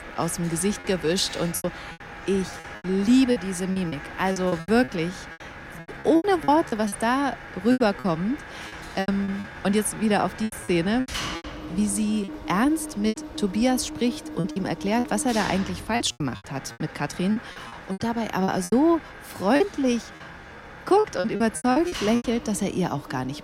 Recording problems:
machinery noise; noticeable; throughout; 15 dB below the speech
chatter from many people; faint; throughout; 25 dB below the speech
choppy; very; 13% of the speech affected

